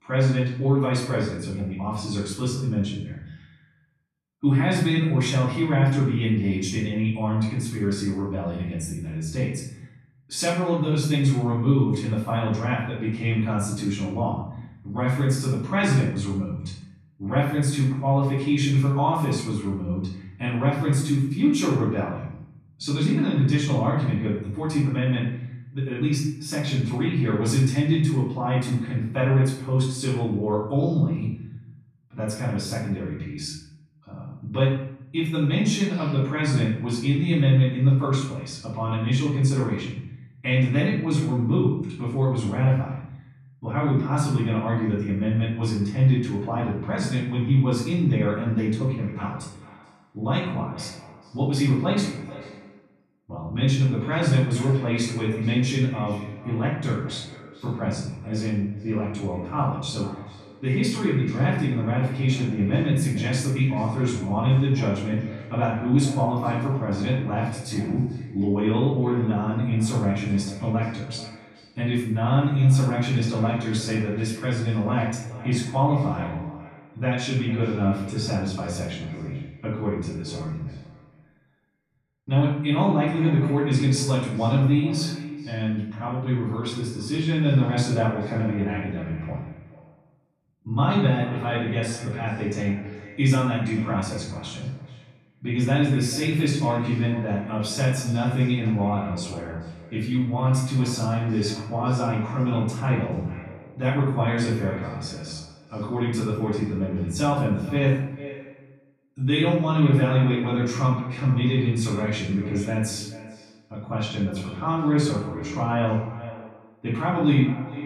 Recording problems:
off-mic speech; far
room echo; noticeable; dies away in 0.7 s
echo of what is said; faint; from 49 s on; 430 ms later, 20 dB below the speech

